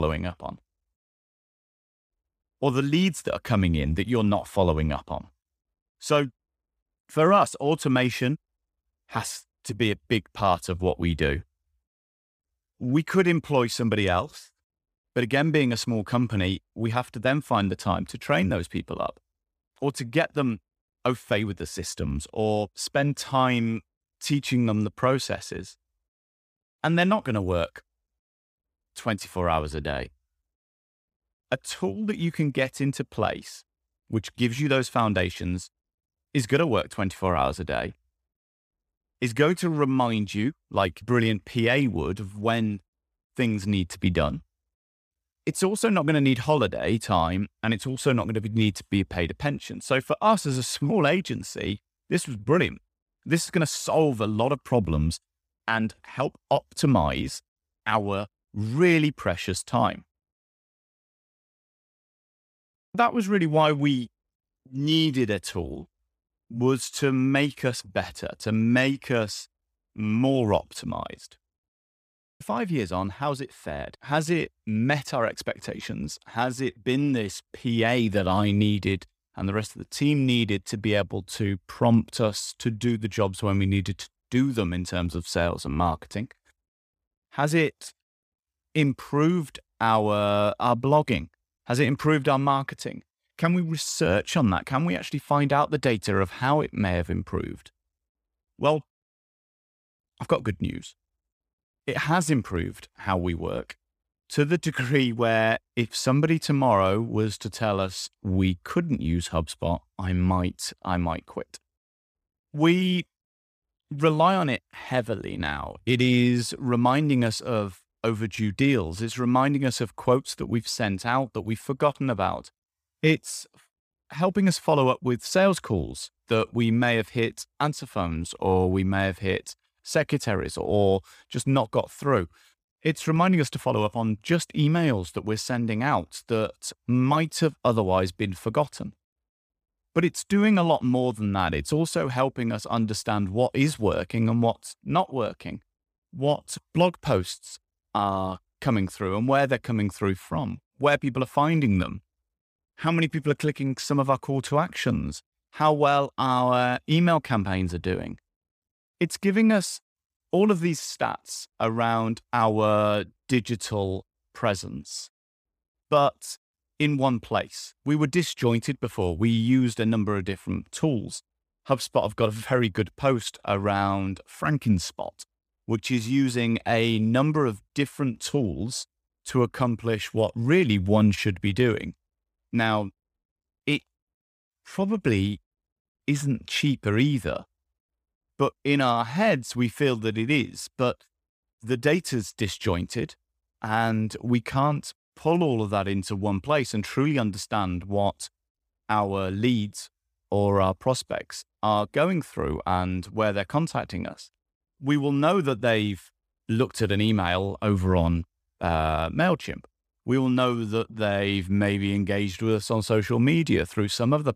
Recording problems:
abrupt cut into speech; at the start

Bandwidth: 15 kHz